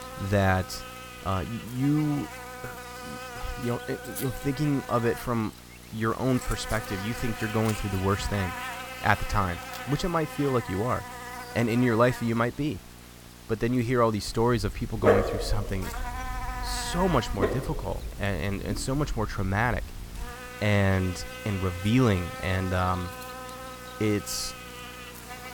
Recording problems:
electrical hum; loud; throughout; 60 Hz, 8 dB below the speech
dog barking; loud; from 15 to 20 s; peak 5 dB above the speech

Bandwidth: 18 kHz